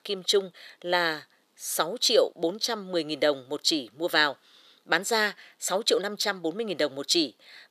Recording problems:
thin; somewhat; fading below 500 Hz

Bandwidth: 14.5 kHz